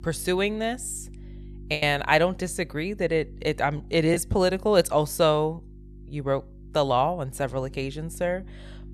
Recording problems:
electrical hum; faint; throughout; 50 Hz, 30 dB below the speech
choppy; occasionally; 2% of the speech affected

